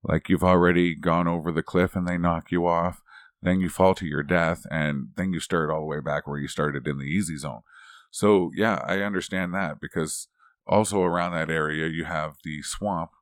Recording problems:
none

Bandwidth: 18 kHz